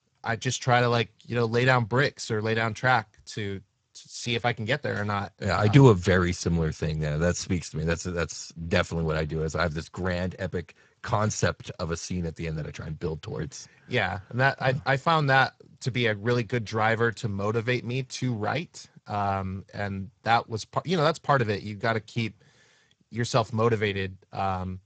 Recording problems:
garbled, watery; badly; nothing above 7.5 kHz

